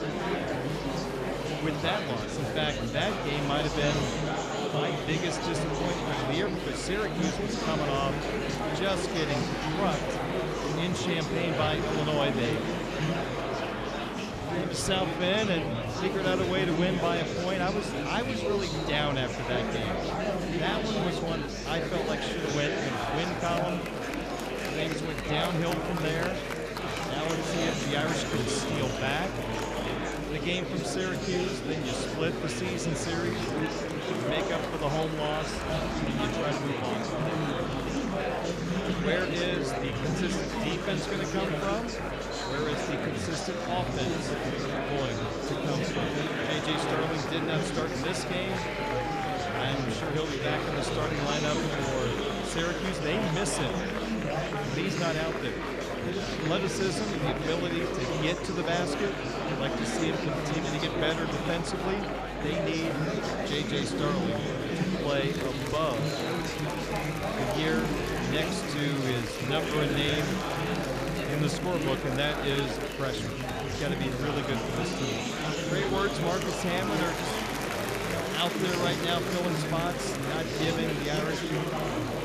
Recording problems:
murmuring crowd; very loud; throughout; 2 dB above the speech

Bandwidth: 14.5 kHz